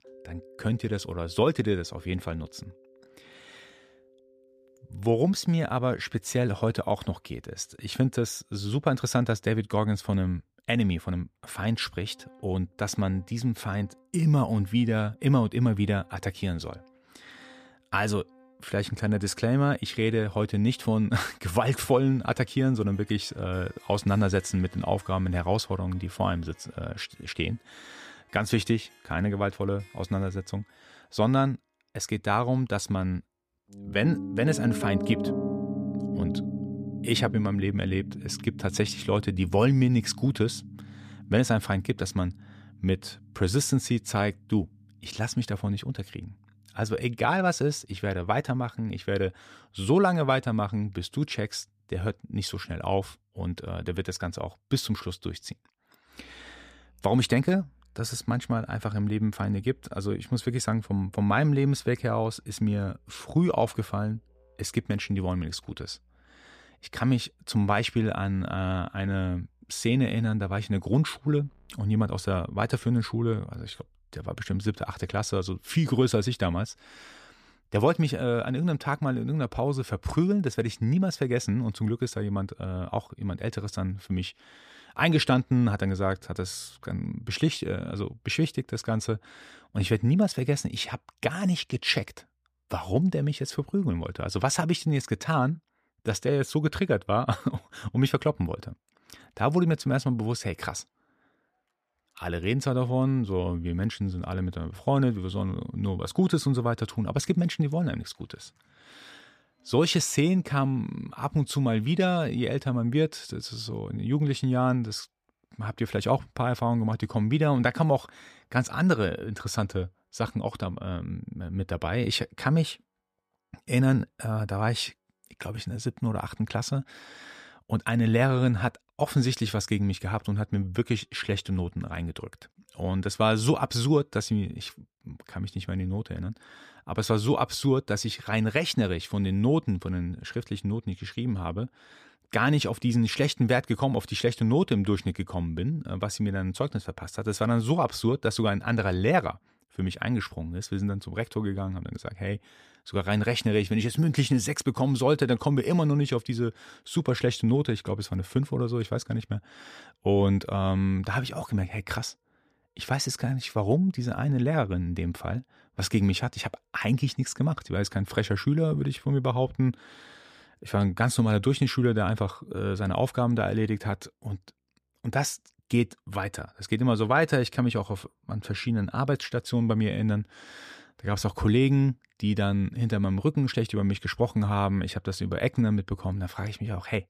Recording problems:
background music; noticeable; throughout; 10 dB below the speech

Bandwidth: 14.5 kHz